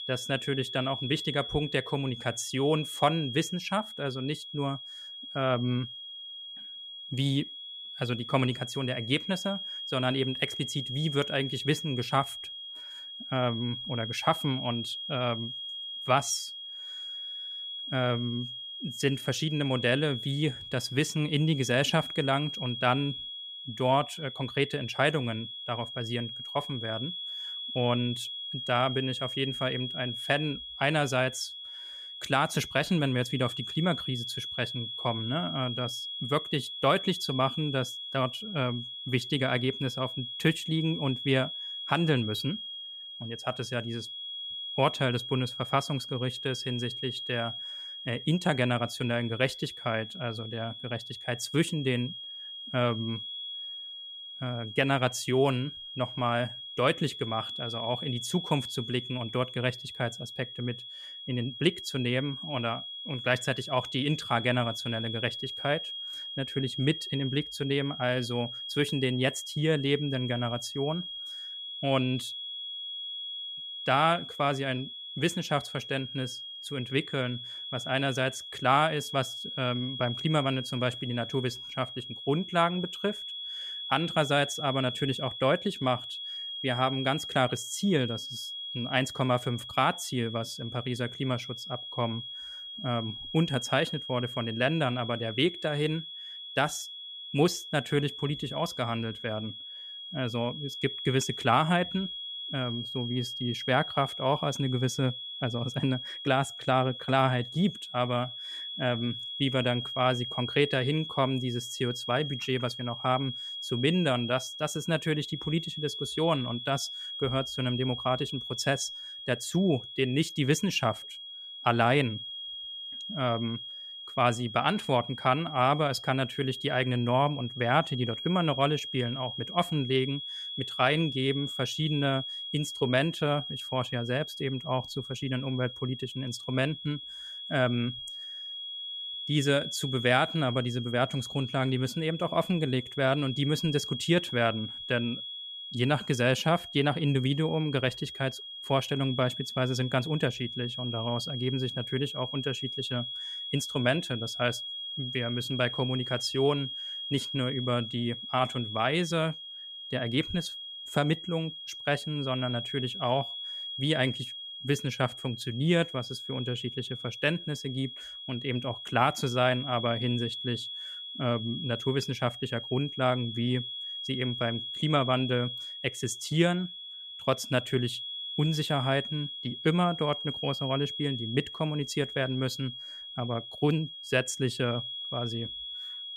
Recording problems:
high-pitched whine; loud; throughout; 3.5 kHz, 7 dB below the speech

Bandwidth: 14.5 kHz